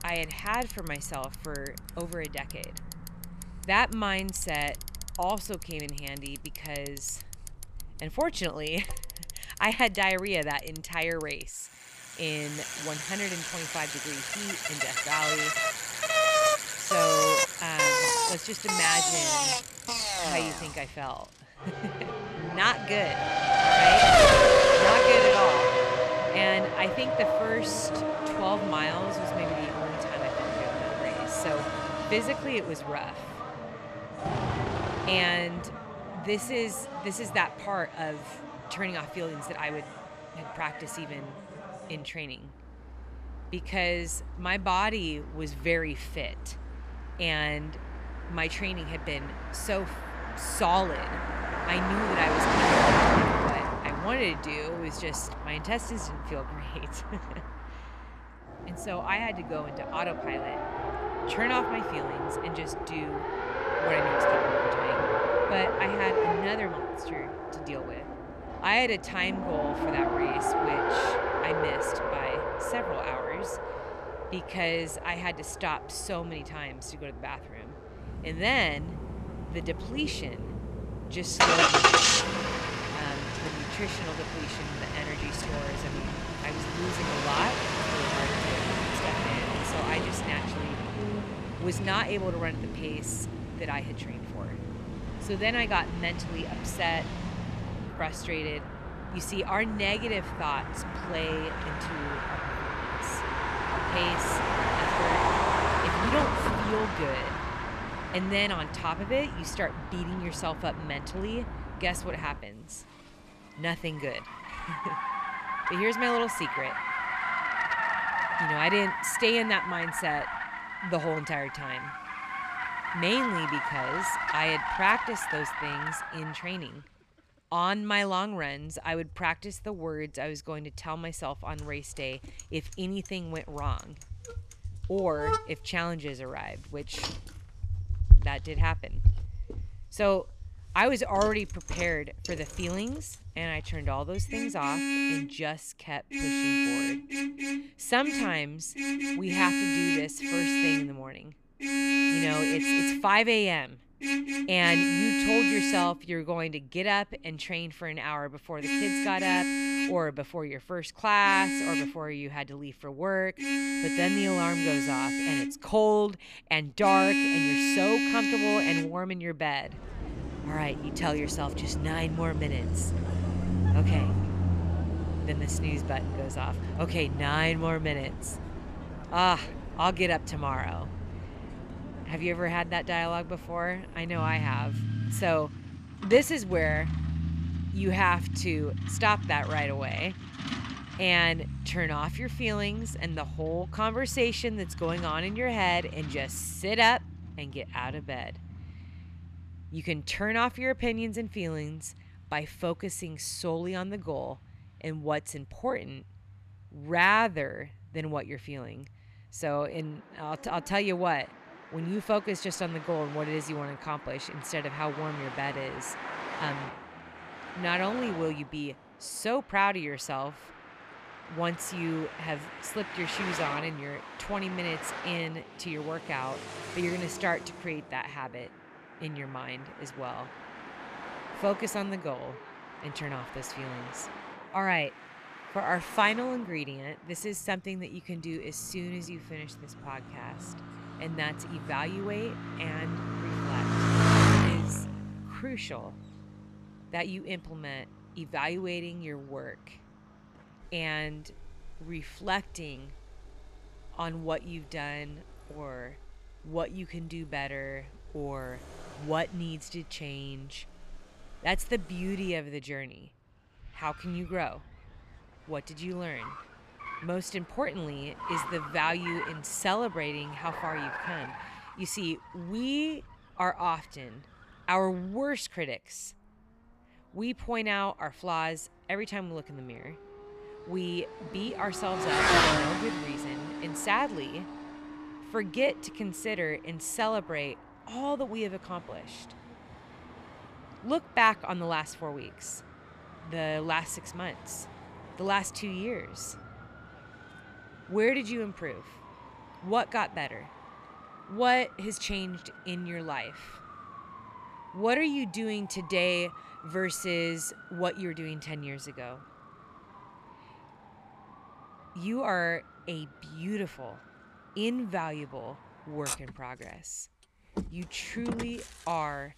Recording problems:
traffic noise; very loud; throughout; 2 dB above the speech

